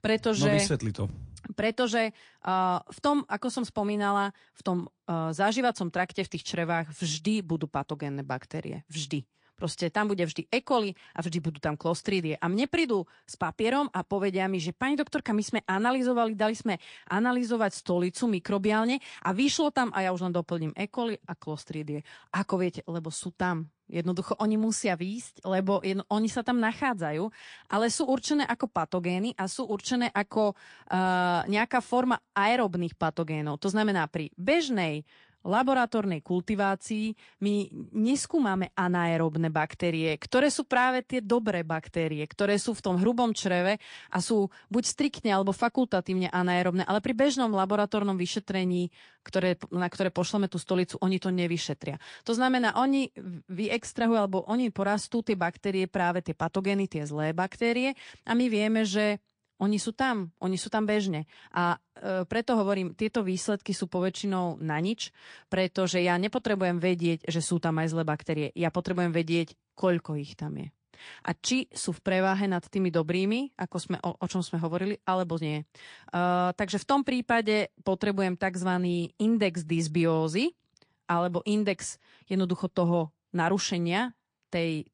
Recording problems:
garbled, watery; slightly; nothing above 9 kHz

